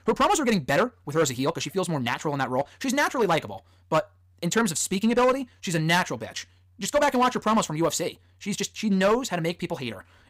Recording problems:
wrong speed, natural pitch; too fast; 1.5 times normal speed
distortion; slight; 4% of the sound clipped

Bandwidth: 15.5 kHz